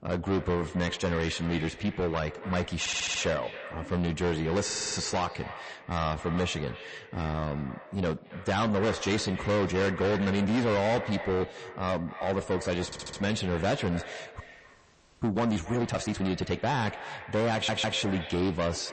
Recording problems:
distortion; heavy; 6 dB below the speech
echo of what is said; noticeable; throughout; 270 ms later, 15 dB below the speech
garbled, watery; slightly; nothing above 8 kHz
audio stuttering; 4 times, first at 3 s
audio freezing; at 14 s for 1 s

